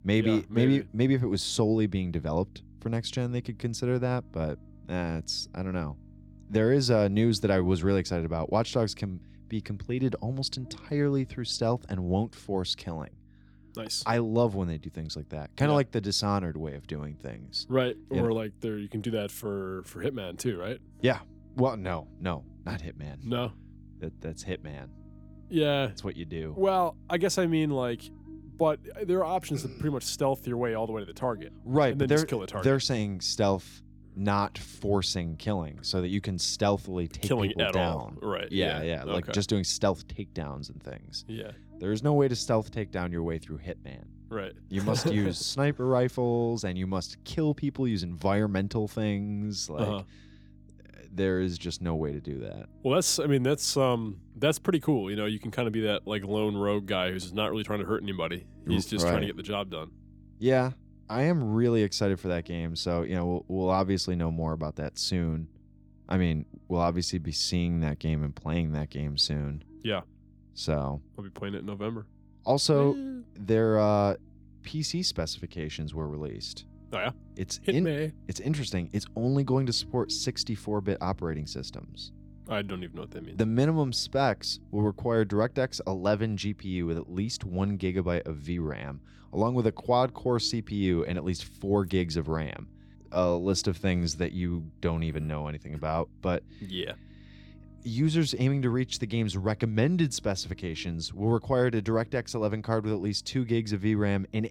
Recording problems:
electrical hum; faint; throughout; 50 Hz, 30 dB below the speech

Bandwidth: 18.5 kHz